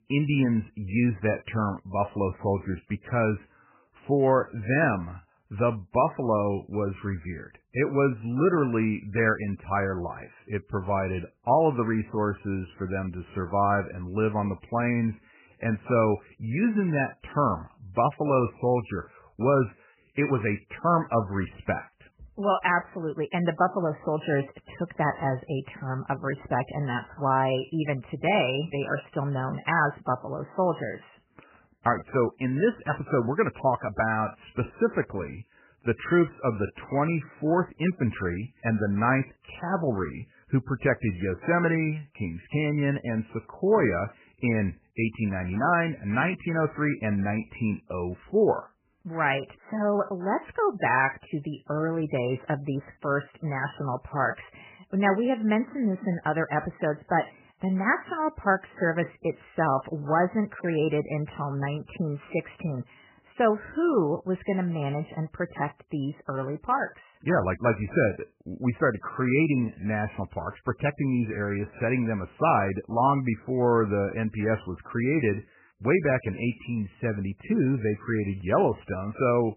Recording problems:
garbled, watery; badly; nothing above 3 kHz

